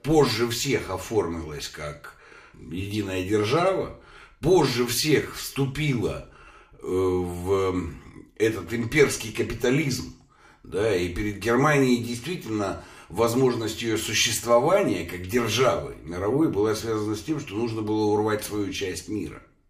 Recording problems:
room echo; very slight; dies away in 0.4 s
off-mic speech; somewhat distant

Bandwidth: 15 kHz